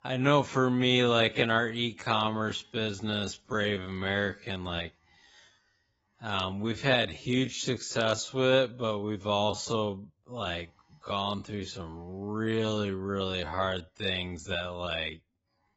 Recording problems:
garbled, watery; badly; nothing above 7.5 kHz
wrong speed, natural pitch; too slow; 0.5 times normal speed

